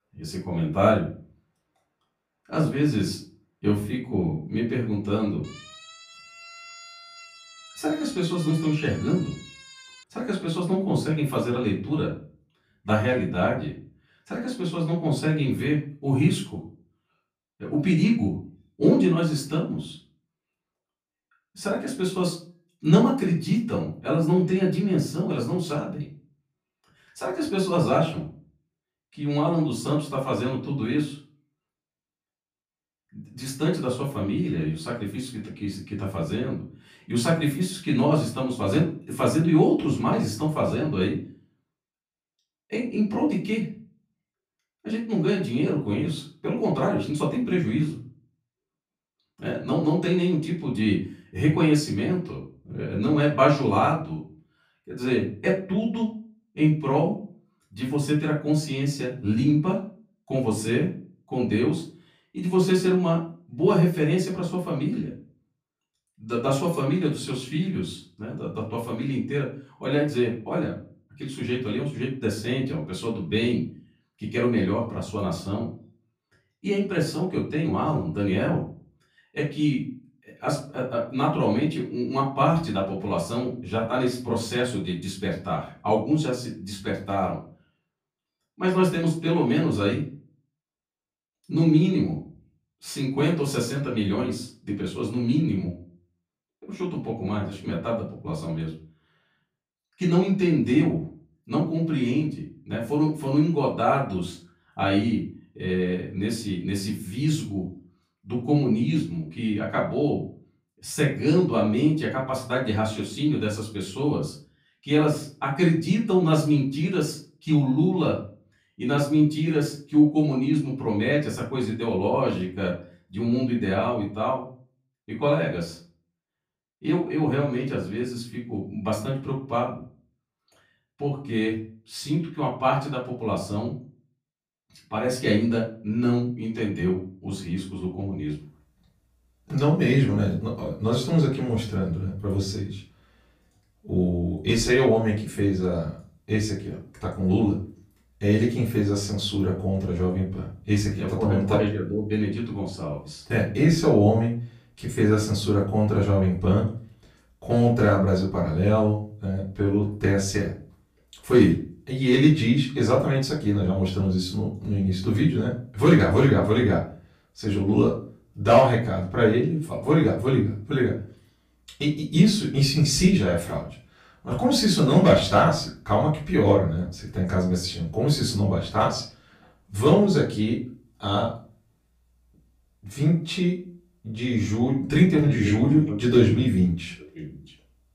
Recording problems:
off-mic speech; far
room echo; slight; dies away in 0.3 s
siren; faint; from 5.5 to 10 s; peak 15 dB below the speech

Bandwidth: 15 kHz